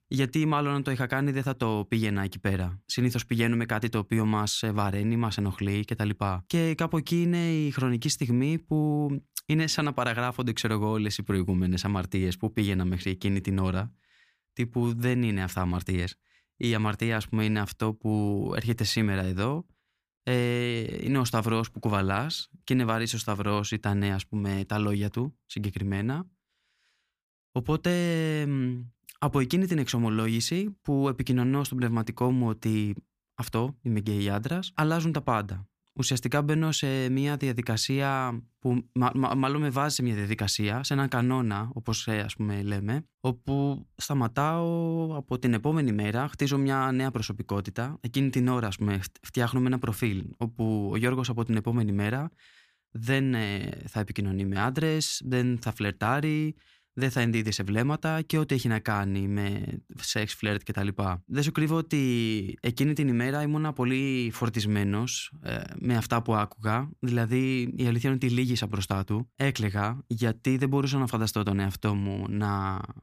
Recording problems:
none

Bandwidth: 15 kHz